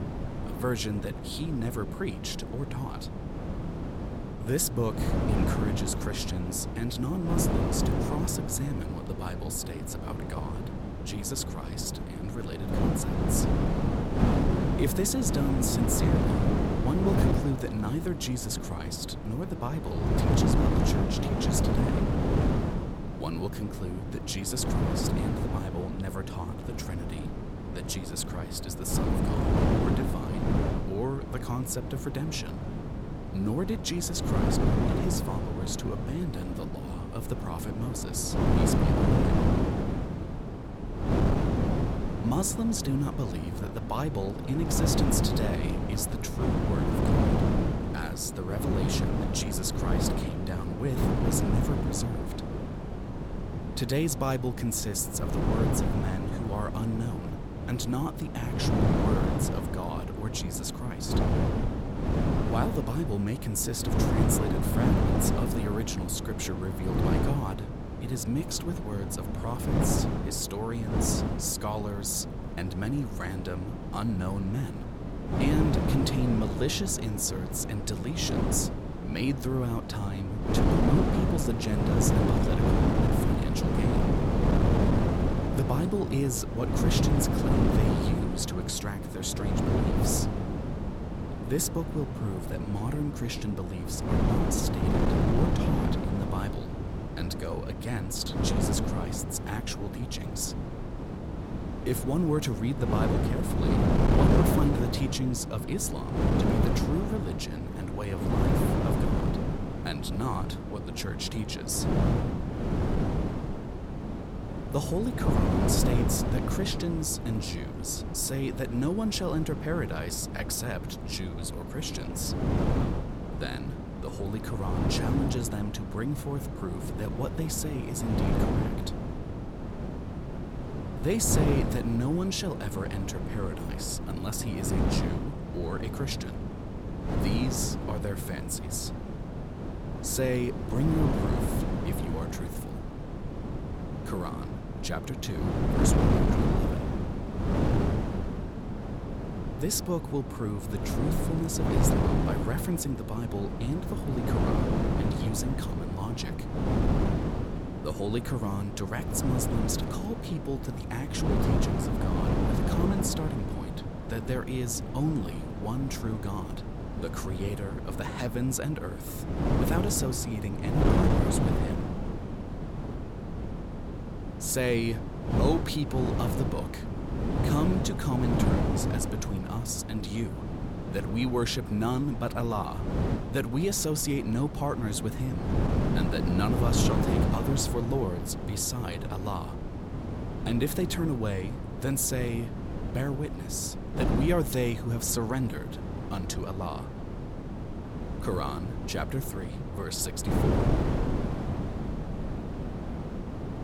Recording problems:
wind noise on the microphone; heavy; as loud as the speech

